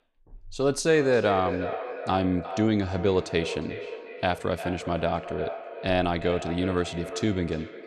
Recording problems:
echo of what is said; strong; throughout; 350 ms later, 10 dB below the speech

